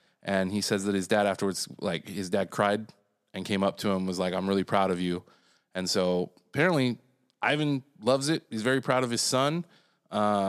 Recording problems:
abrupt cut into speech; at the end

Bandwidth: 14.5 kHz